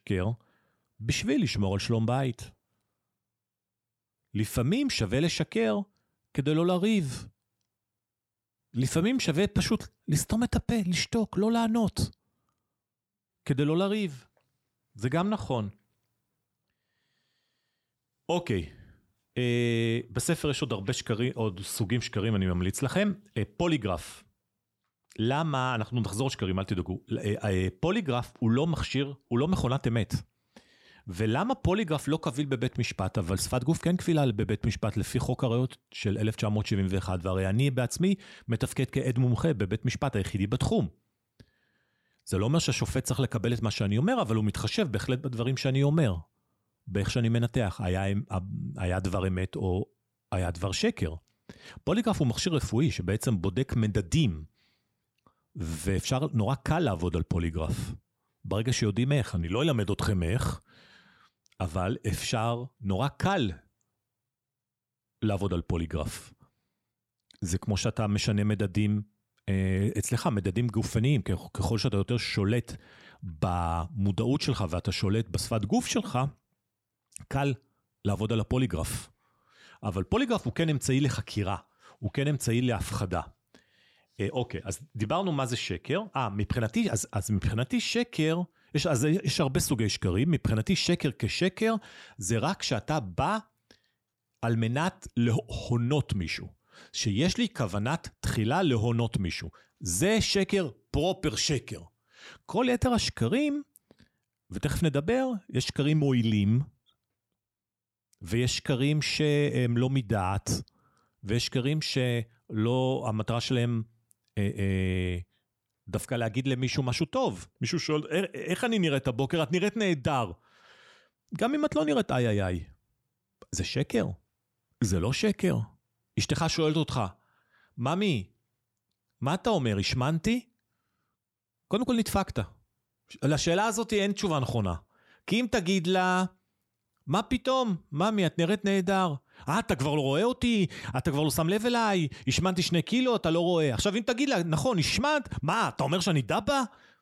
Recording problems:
none

